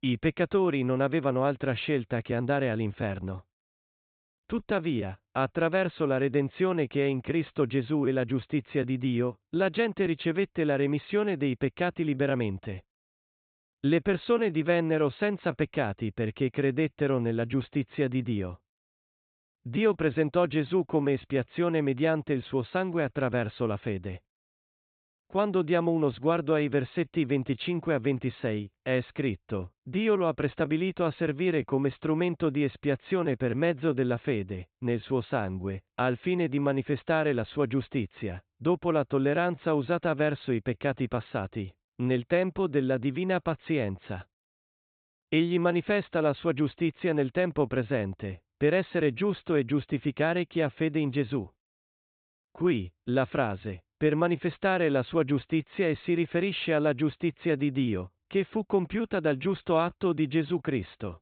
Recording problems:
high frequencies cut off; severe; nothing above 4 kHz

